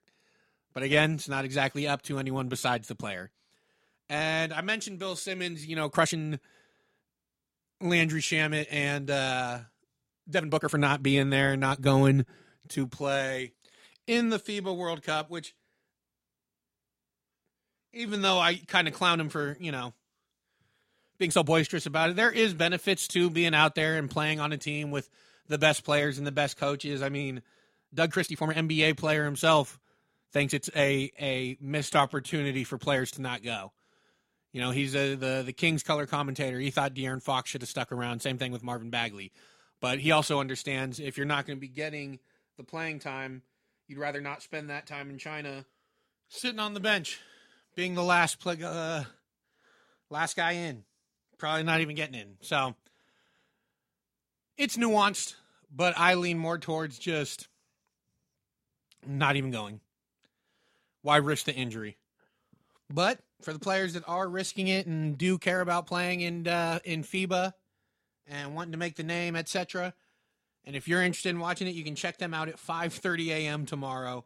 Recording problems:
uneven, jittery; strongly; from 6 s to 1:04

